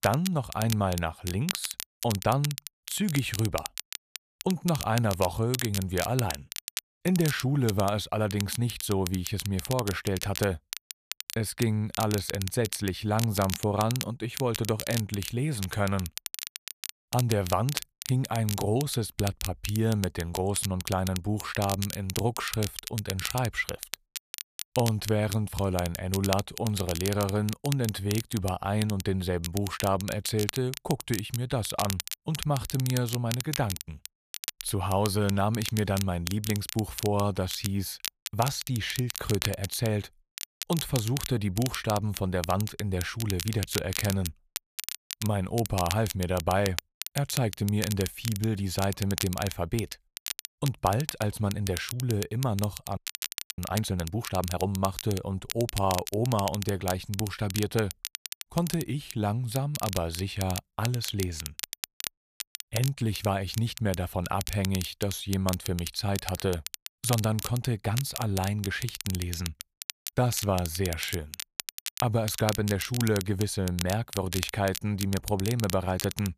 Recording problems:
crackle, like an old record; loud; 7 dB below the speech
audio freezing; at 53 s for 0.5 s

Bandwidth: 14.5 kHz